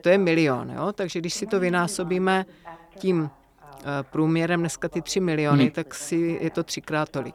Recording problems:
voice in the background; faint; throughout; 20 dB below the speech

